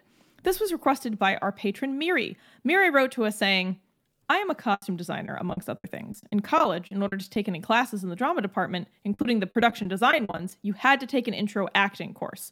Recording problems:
choppy; very; from 4.5 to 7.5 s and from 9 to 11 s; 15% of the speech affected

